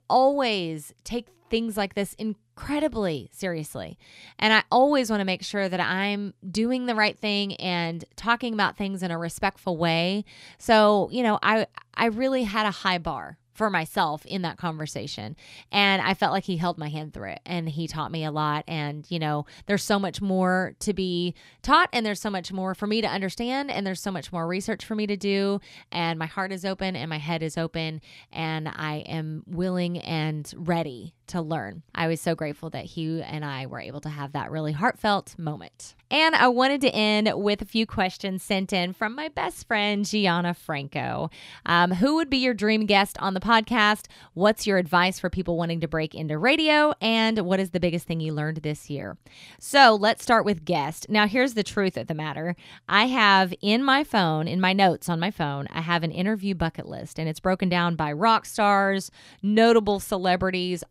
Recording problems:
none

